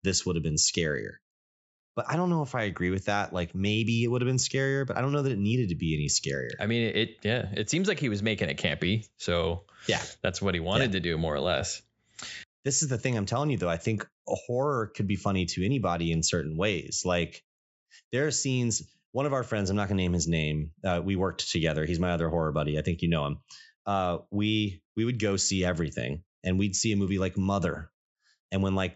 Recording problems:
high frequencies cut off; noticeable; nothing above 8 kHz

